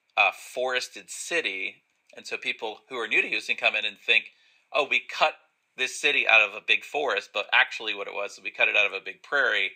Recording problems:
thin; very; fading below 600 Hz

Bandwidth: 15.5 kHz